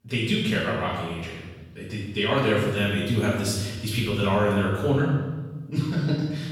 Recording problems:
off-mic speech; far
room echo; noticeable; dies away in 1.2 s

